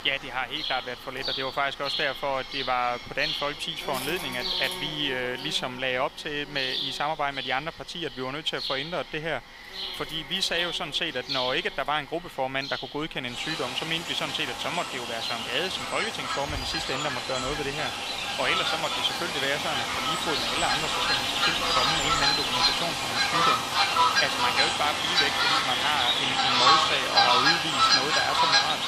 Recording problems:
thin; somewhat; fading below 500 Hz
animal sounds; very loud; throughout; 5 dB above the speech

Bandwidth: 15 kHz